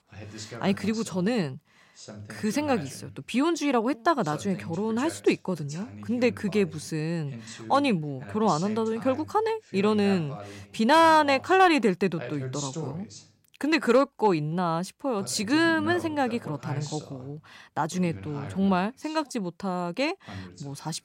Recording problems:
voice in the background; noticeable; throughout; 15 dB below the speech

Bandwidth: 16 kHz